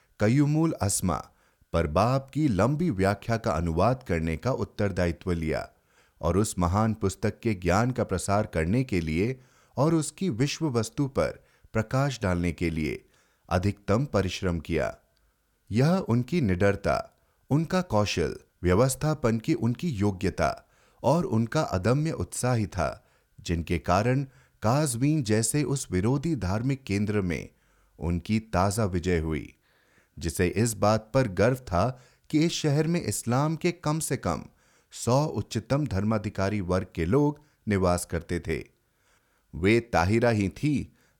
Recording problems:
none

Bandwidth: 18.5 kHz